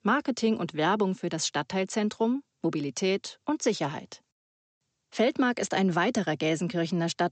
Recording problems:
high frequencies cut off; noticeable; nothing above 8 kHz

